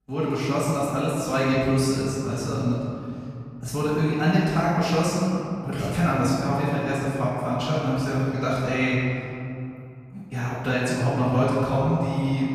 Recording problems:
room echo; strong; dies away in 2.7 s
off-mic speech; far

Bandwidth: 14 kHz